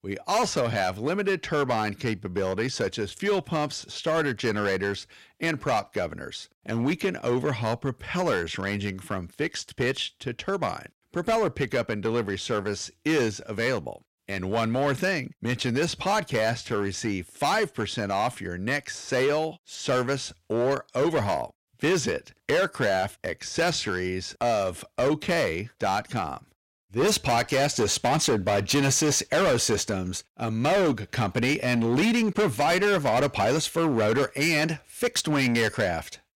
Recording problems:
distortion; heavy; 10% of the sound clipped

